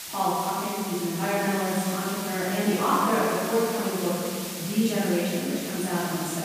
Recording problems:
room echo; strong; dies away in 2.8 s
off-mic speech; far
hiss; very faint; throughout; 8 dB below the speech

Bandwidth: 15 kHz